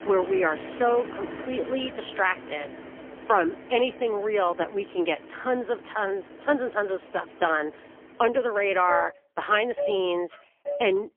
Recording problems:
phone-call audio; poor line; nothing above 3.5 kHz
traffic noise; noticeable; throughout; 10 dB below the speech

